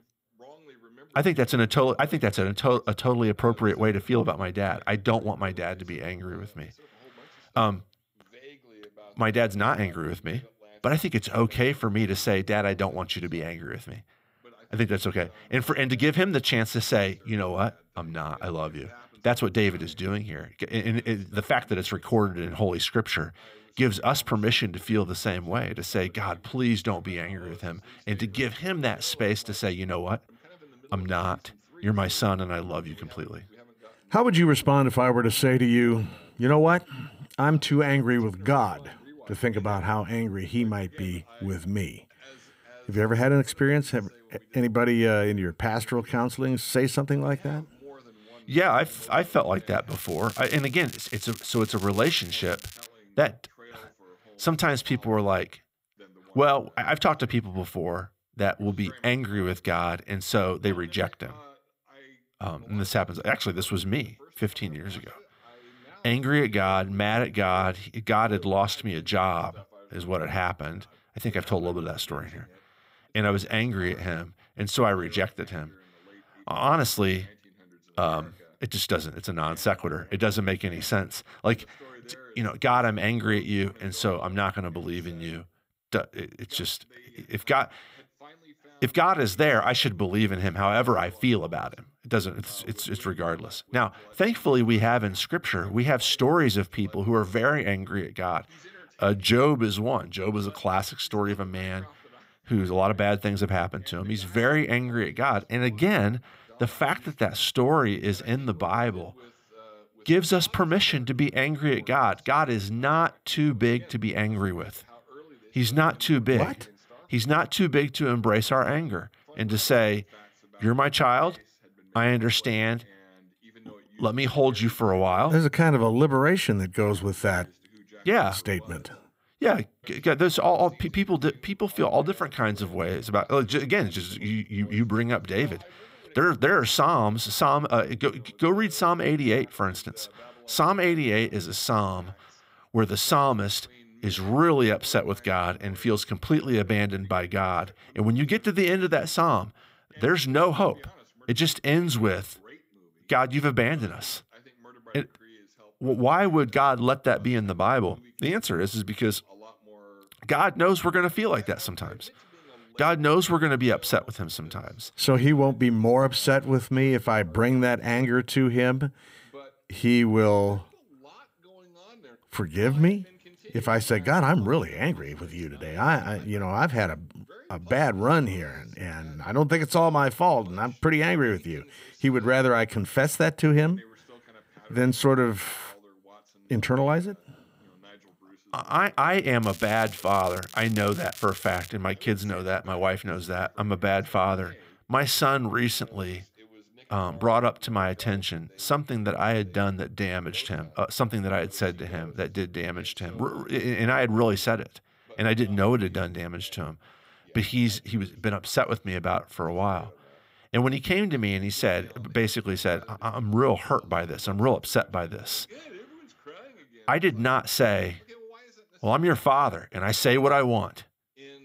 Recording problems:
crackling; noticeable; from 50 to 53 s and from 3:09 to 3:12; 15 dB below the speech
voice in the background; faint; throughout; 30 dB below the speech

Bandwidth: 15.5 kHz